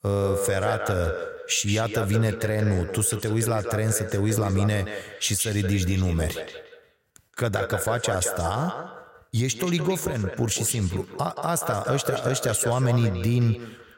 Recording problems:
echo of what is said; strong; throughout; 180 ms later, 8 dB below the speech

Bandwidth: 16 kHz